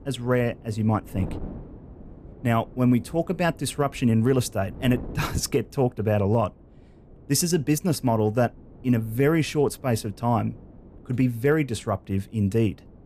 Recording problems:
wind noise on the microphone; occasional gusts; 25 dB below the speech

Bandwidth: 14.5 kHz